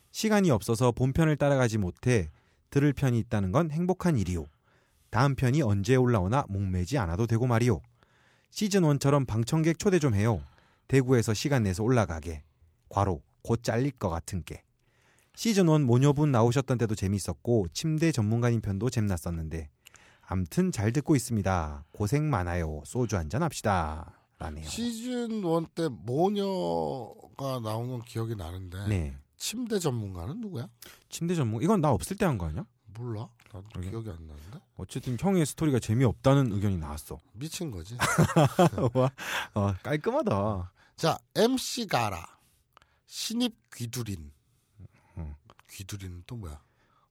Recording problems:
none

